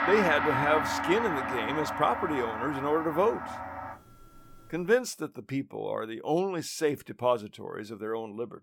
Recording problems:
background music; loud; until 5 s; 2 dB below the speech

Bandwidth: 17.5 kHz